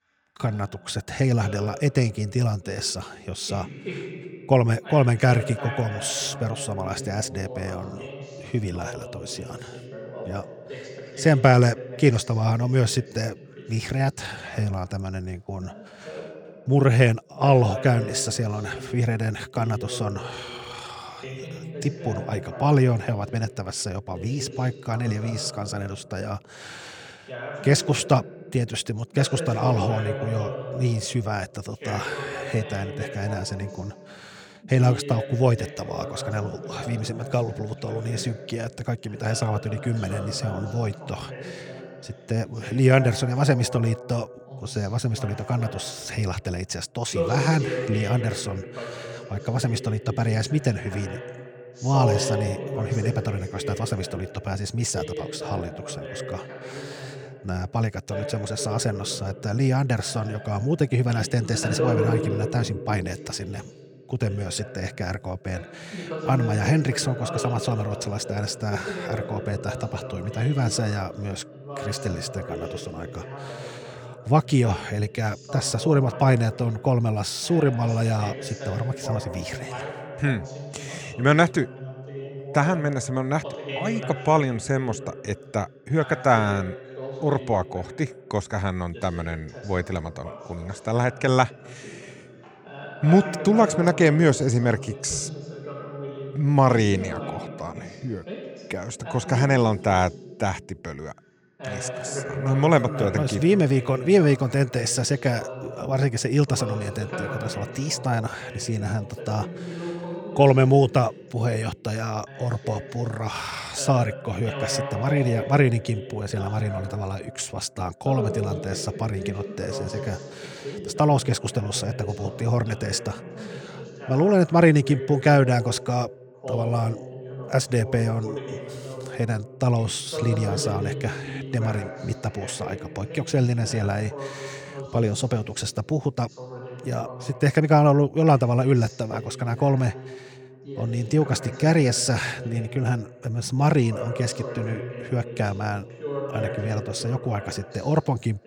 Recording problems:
voice in the background; noticeable; throughout; 10 dB below the speech

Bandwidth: 19 kHz